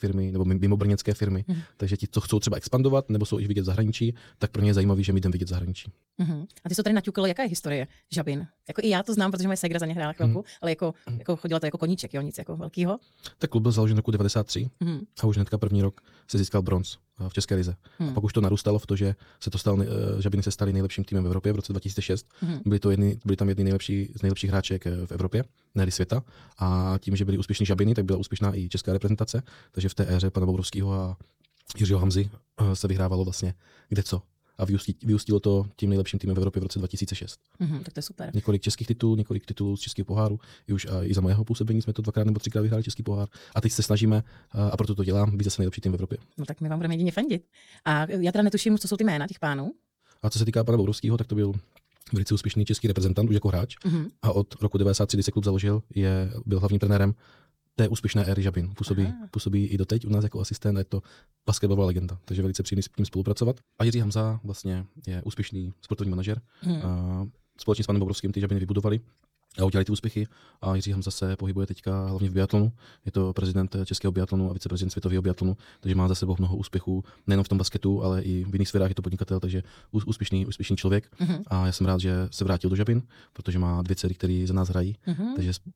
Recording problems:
wrong speed, natural pitch; too fast; 1.5 times normal speed

